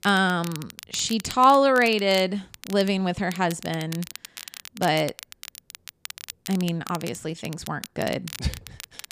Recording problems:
crackle, like an old record; noticeable; 15 dB below the speech

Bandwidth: 15 kHz